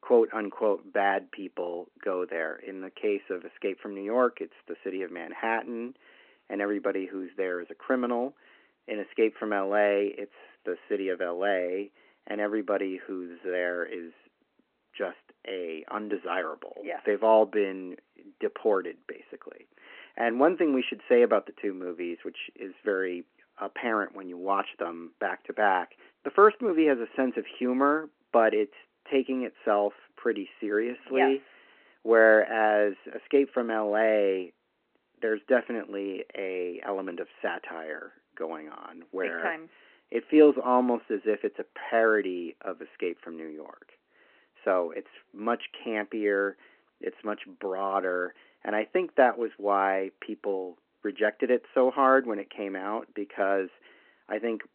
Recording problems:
phone-call audio

